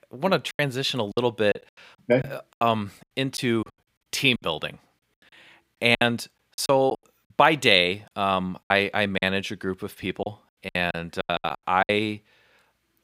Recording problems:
choppy; very; 12% of the speech affected

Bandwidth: 15.5 kHz